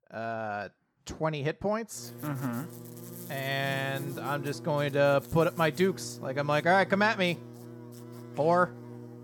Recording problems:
electrical hum; noticeable; from 2 s on; 60 Hz, 20 dB below the speech

